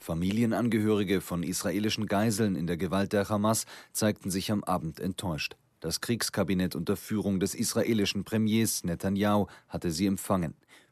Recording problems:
none

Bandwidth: 13.5 kHz